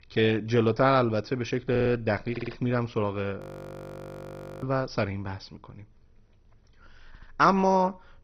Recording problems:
garbled, watery; badly; nothing above 15.5 kHz
audio stuttering; at 1.5 s, at 2.5 s and at 7 s
audio freezing; at 3.5 s for 1 s

